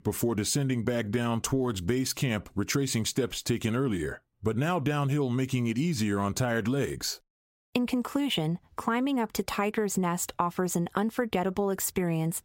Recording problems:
squashed, flat; somewhat

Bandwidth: 16 kHz